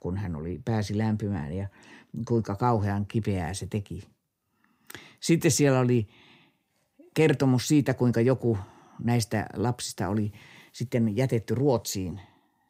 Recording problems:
none

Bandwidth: 15.5 kHz